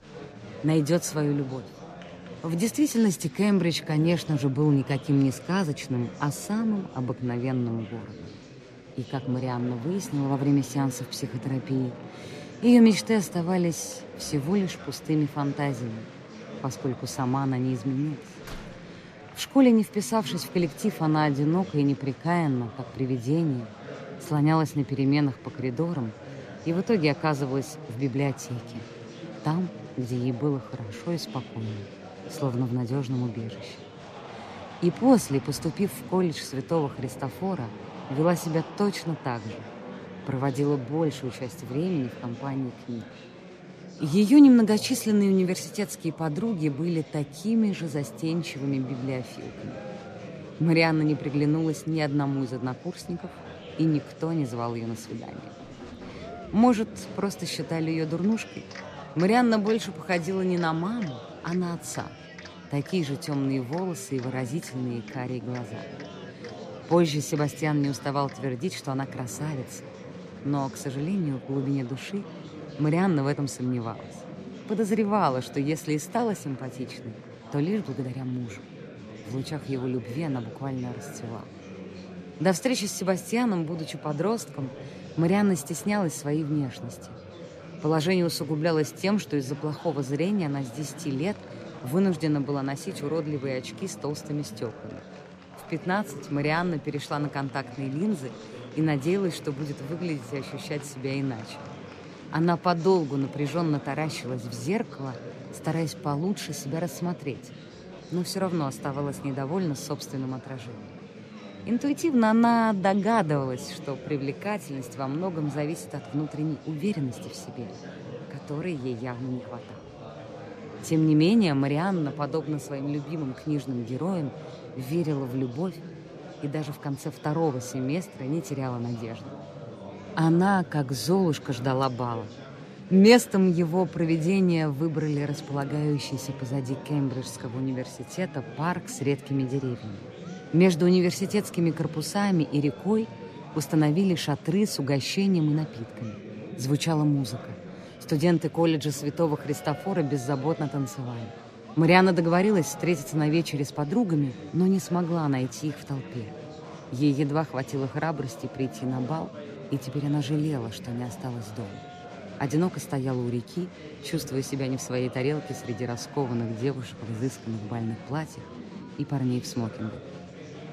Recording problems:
chatter from many people; noticeable; throughout; 15 dB below the speech
door banging; faint; at 18 s and at 56 s; peak 15 dB below the speech

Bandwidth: 14.5 kHz